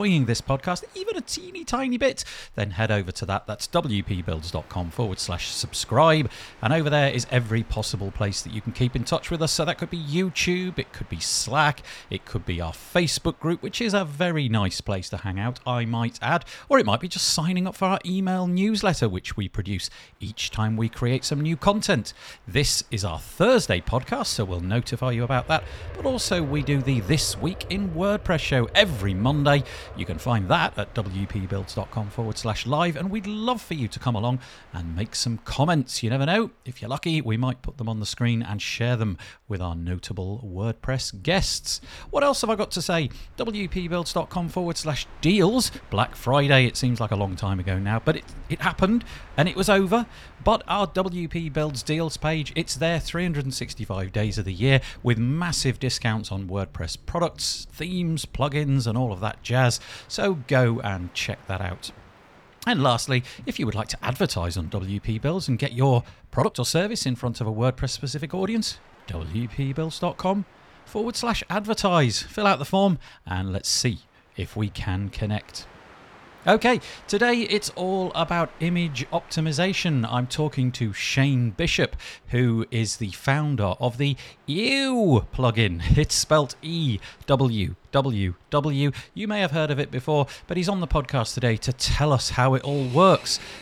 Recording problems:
train or aircraft noise; faint; throughout; 20 dB below the speech
abrupt cut into speech; at the start
uneven, jittery; strongly; from 20 s to 1:23

